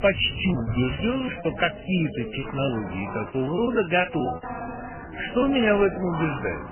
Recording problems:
garbled, watery; badly; nothing above 3 kHz
animal sounds; noticeable; throughout; 15 dB below the speech
background chatter; noticeable; throughout; 3 voices, 10 dB below the speech
wind noise on the microphone; occasional gusts; until 4 s; 25 dB below the speech
choppy; very; from 0.5 to 2.5 s and from 3.5 to 6 s; 18% of the speech affected

